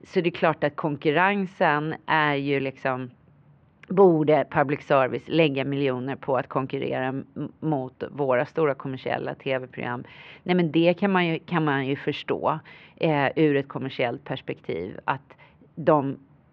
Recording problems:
muffled; very; fading above 2.5 kHz

